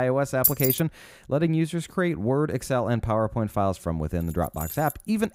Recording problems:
abrupt cut into speech; at the start
jangling keys; loud; at 0.5 s; peak 5 dB above the speech
jangling keys; noticeable; at 4 s; peak 9 dB below the speech

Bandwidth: 15.5 kHz